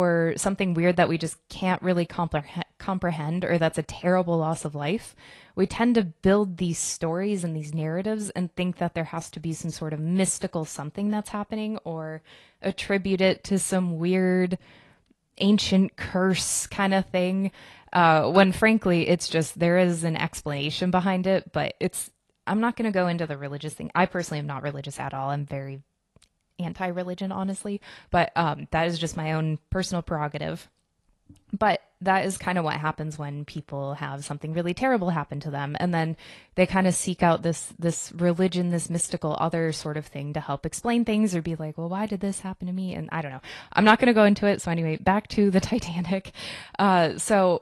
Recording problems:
garbled, watery; slightly
abrupt cut into speech; at the start

